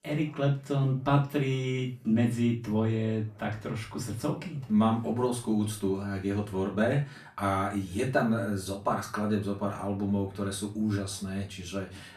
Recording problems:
off-mic speech; far
room echo; slight; dies away in 0.3 s
background chatter; faint; throughout; 3 voices, 30 dB below the speech

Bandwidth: 14.5 kHz